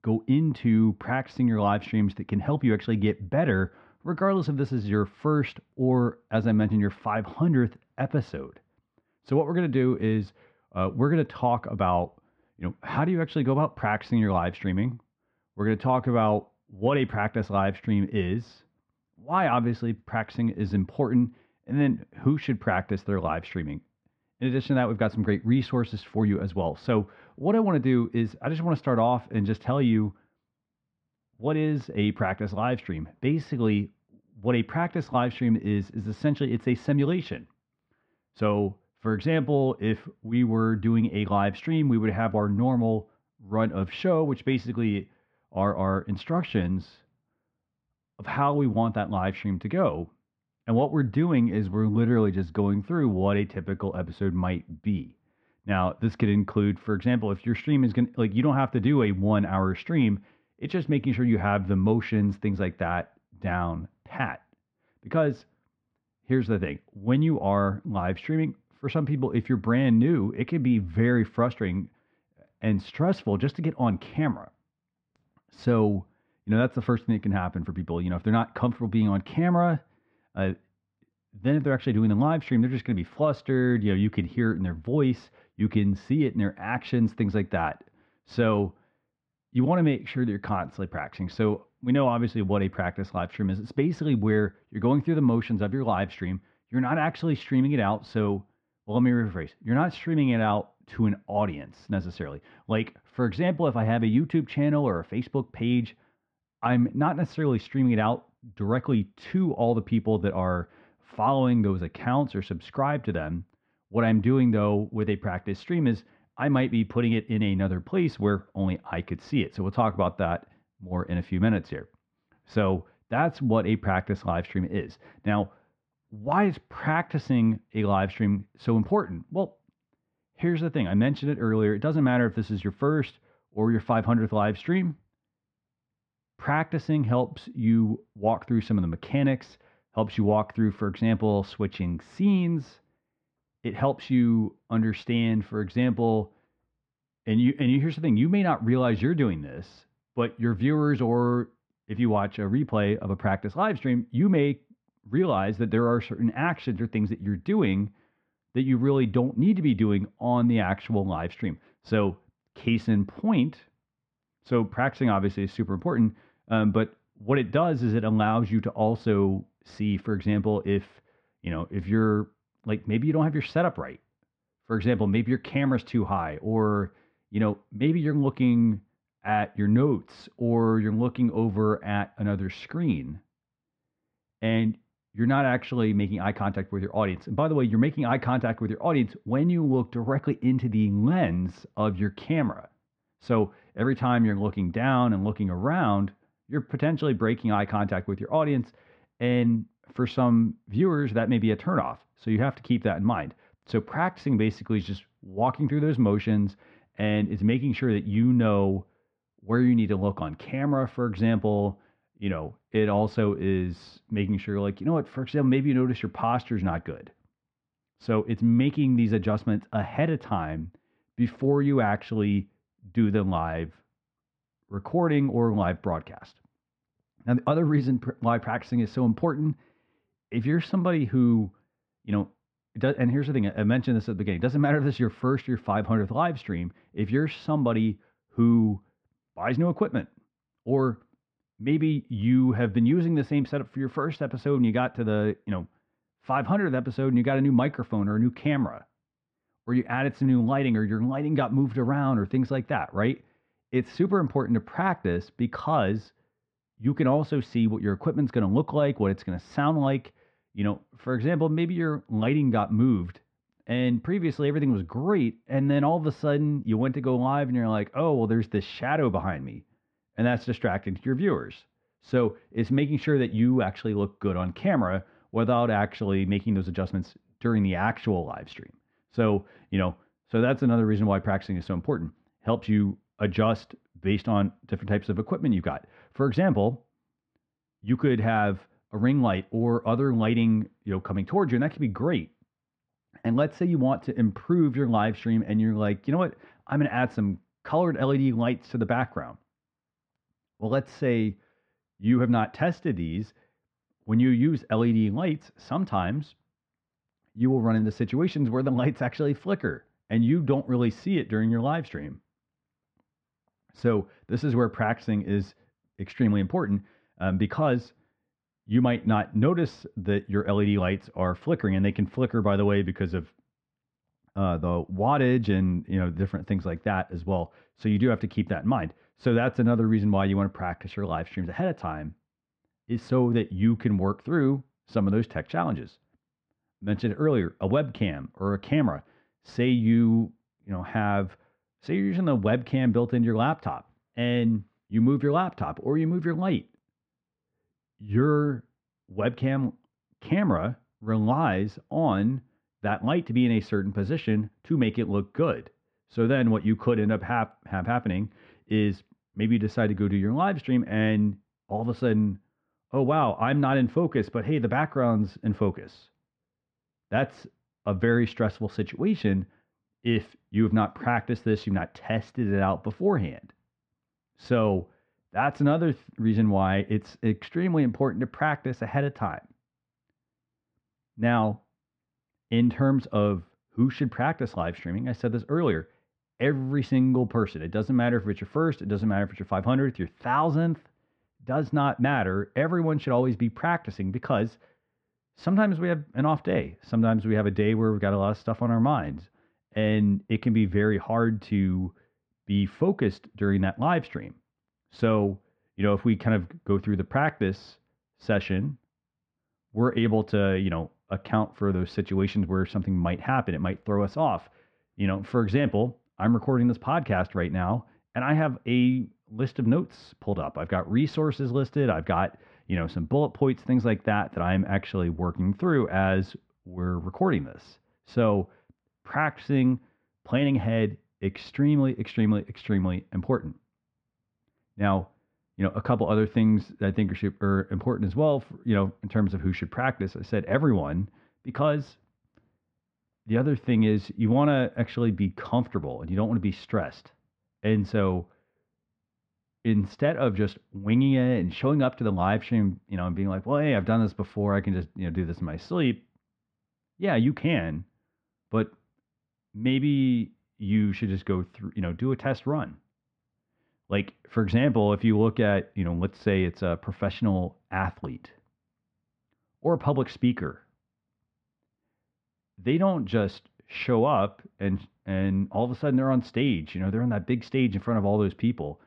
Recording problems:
muffled; very; fading above 2 kHz

